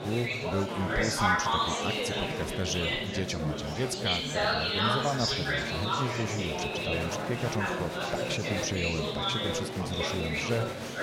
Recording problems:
chatter from many people; very loud; throughout; 4 dB above the speech

